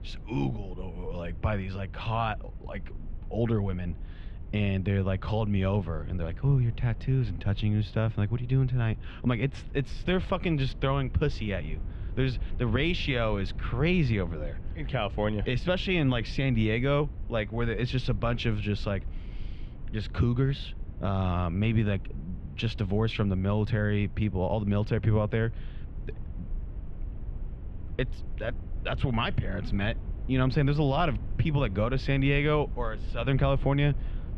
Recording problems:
muffled; very; fading above 3 kHz
low rumble; faint; throughout; 20 dB below the speech

